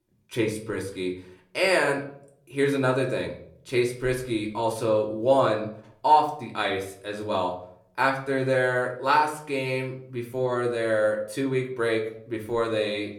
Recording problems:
room echo; very slight; dies away in 0.5 s
off-mic speech; somewhat distant

